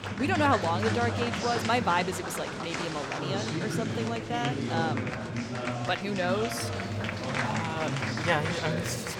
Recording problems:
murmuring crowd; loud; throughout; 1 dB below the speech

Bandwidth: 17.5 kHz